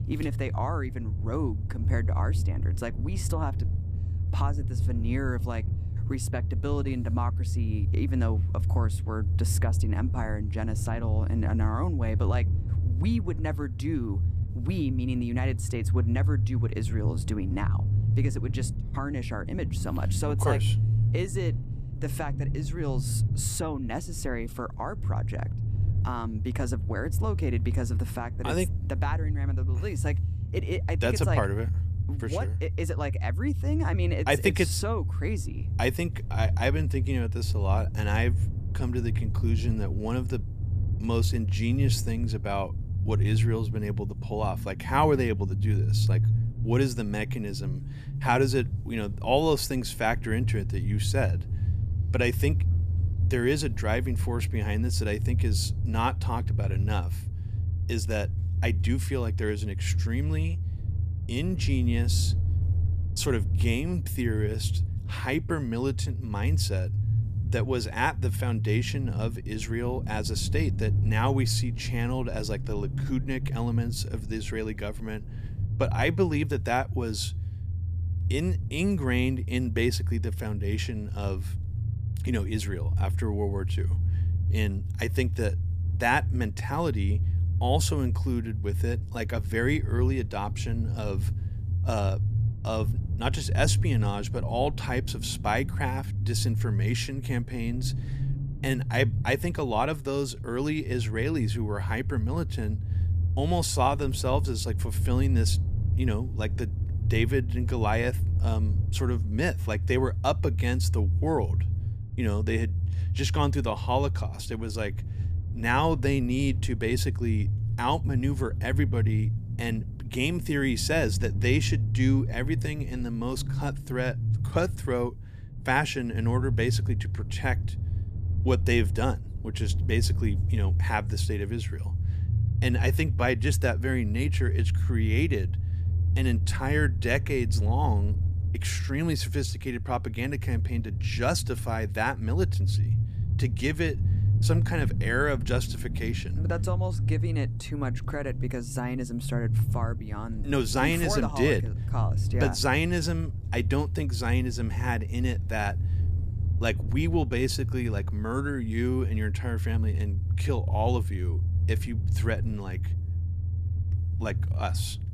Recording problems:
low rumble; noticeable; throughout; 10 dB below the speech

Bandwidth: 14.5 kHz